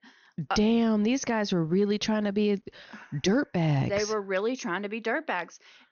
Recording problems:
high frequencies cut off; noticeable; nothing above 6.5 kHz

